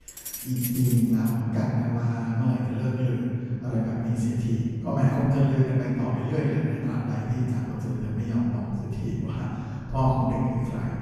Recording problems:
room echo; strong; dies away in 2.6 s
off-mic speech; far
jangling keys; noticeable; until 1.5 s; peak 6 dB below the speech

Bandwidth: 13.5 kHz